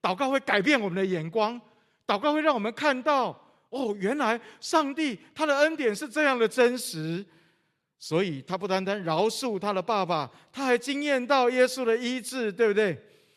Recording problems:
none

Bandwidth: 13.5 kHz